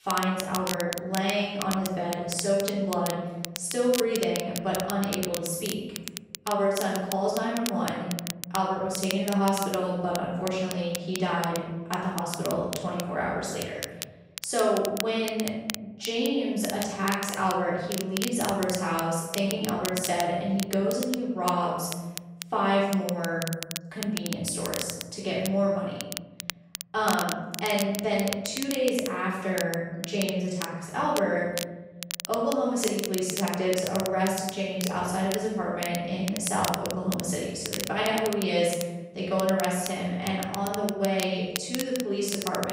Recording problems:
room echo; strong; dies away in 1.2 s
off-mic speech; far
crackle, like an old record; loud; 8 dB below the speech
abrupt cut into speech; at the end

